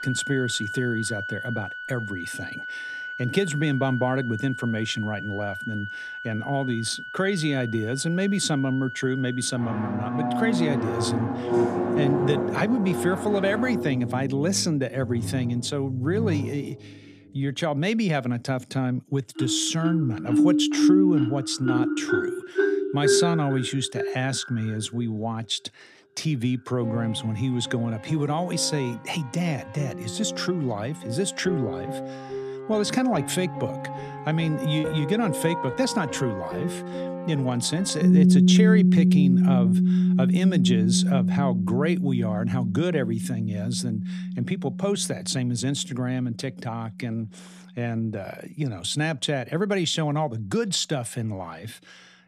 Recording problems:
background music; very loud; throughout; as loud as the speech
choppy; occasionally; at 35 s; 2% of the speech affected

